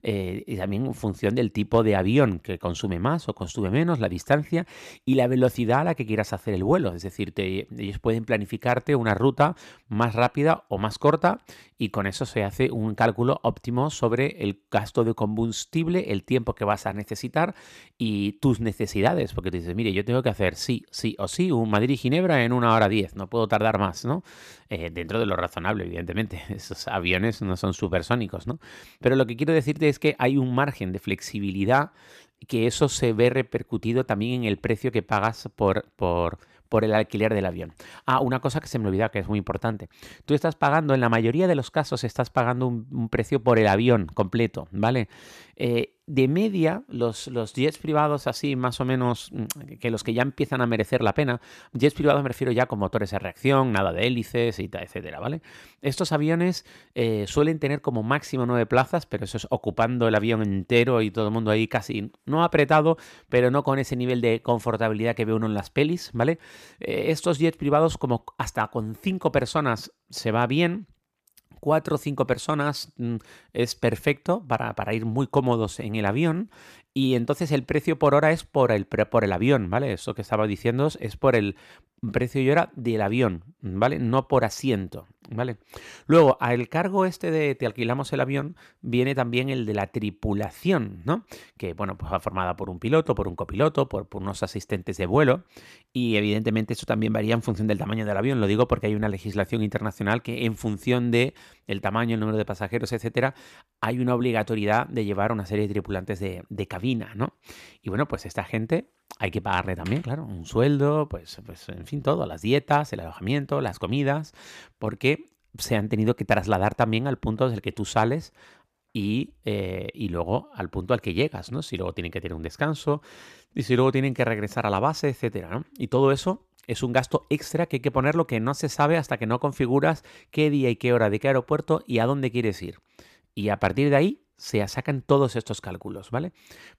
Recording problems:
none

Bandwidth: 14.5 kHz